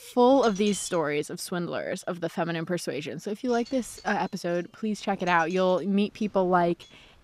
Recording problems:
wind noise on the microphone; occasional gusts; 20 dB below the speech

